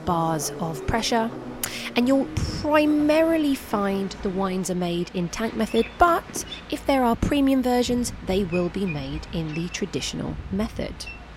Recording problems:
train or aircraft noise; noticeable; throughout; 15 dB below the speech

